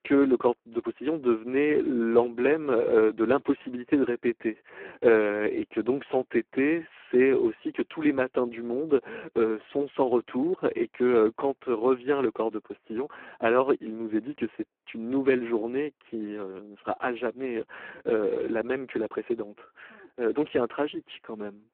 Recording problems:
phone-call audio; poor line

